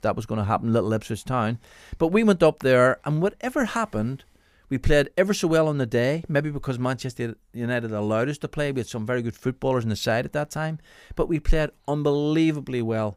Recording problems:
none

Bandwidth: 15 kHz